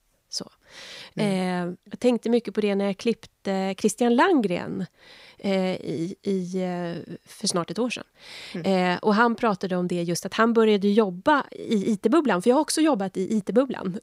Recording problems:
none

